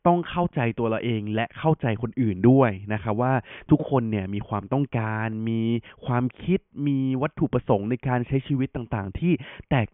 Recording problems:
high frequencies cut off; severe; nothing above 3.5 kHz

